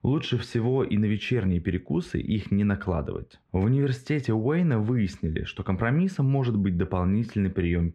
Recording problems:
muffled; very; fading above 2 kHz

